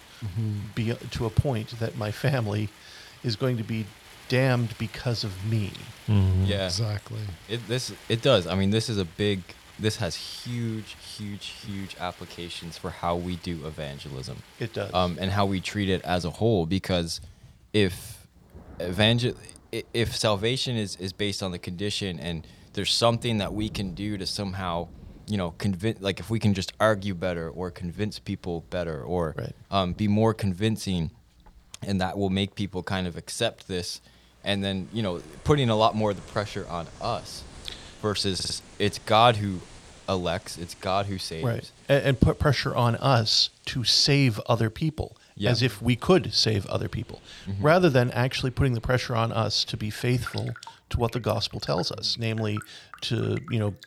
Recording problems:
rain or running water; faint; throughout; 20 dB below the speech
audio stuttering; at 38 s

